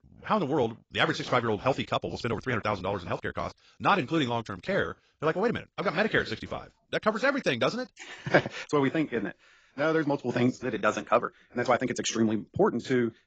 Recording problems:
garbled, watery; badly; nothing above 7.5 kHz
wrong speed, natural pitch; too fast; 1.5 times normal speed

